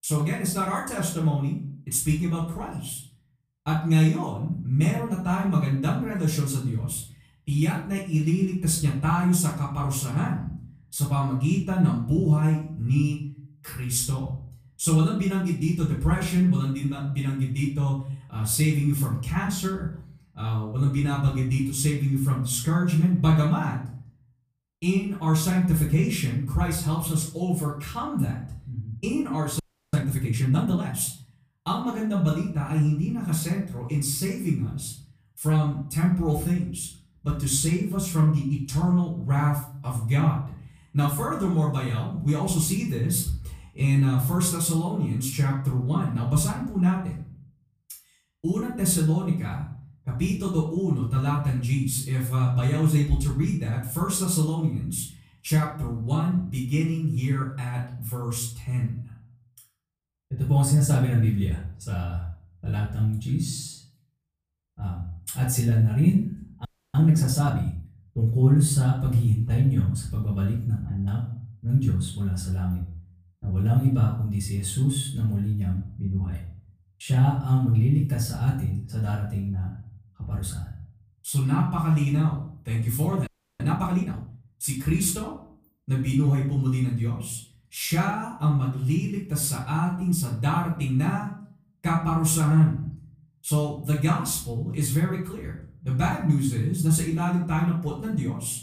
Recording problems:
off-mic speech; far
room echo; slight; dies away in 0.5 s
audio freezing; at 30 s, at 1:07 and at 1:23

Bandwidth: 15 kHz